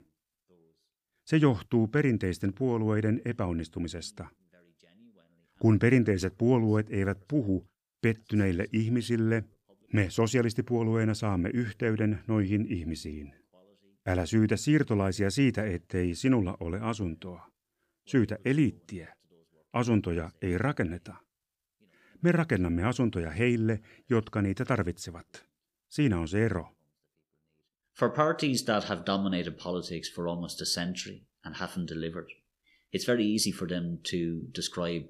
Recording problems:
none

